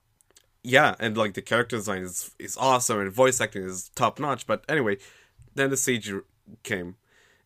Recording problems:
none

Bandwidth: 15 kHz